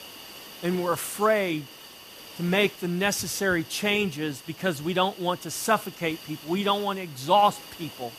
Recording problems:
hiss; noticeable; throughout; 15 dB below the speech

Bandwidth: 14.5 kHz